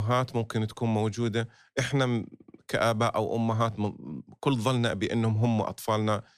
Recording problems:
abrupt cut into speech; at the start

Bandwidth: 14.5 kHz